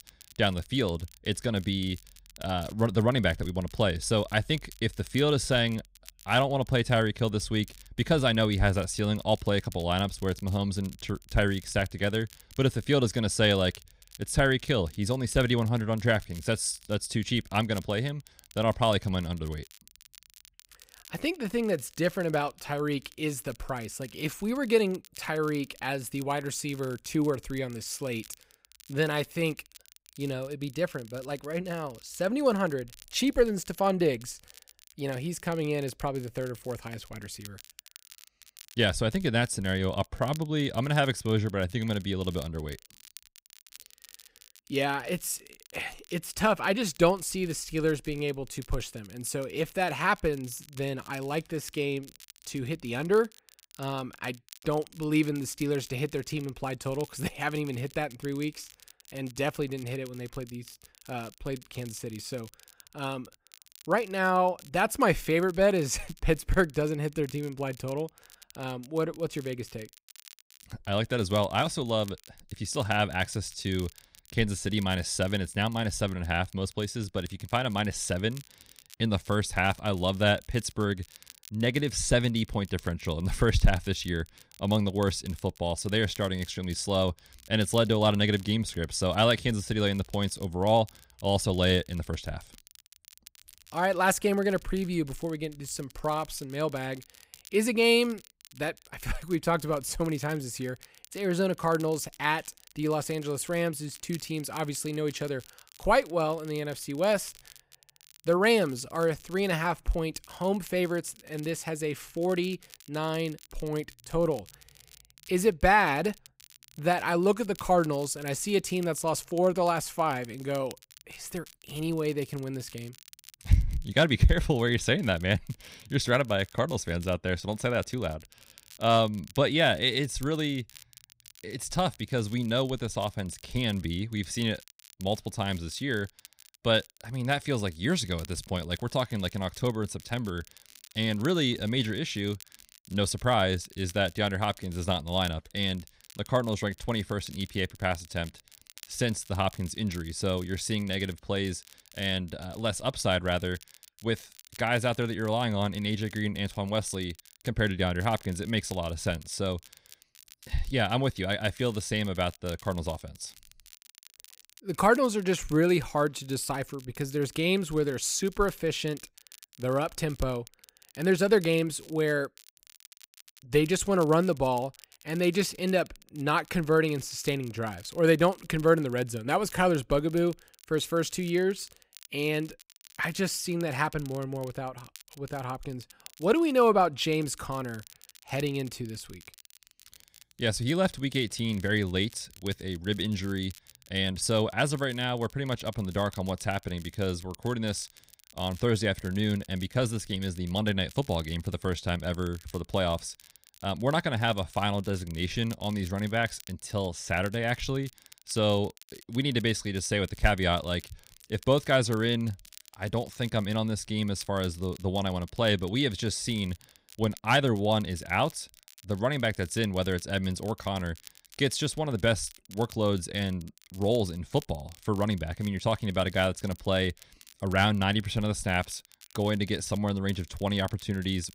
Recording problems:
crackle, like an old record; faint; 25 dB below the speech

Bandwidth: 15.5 kHz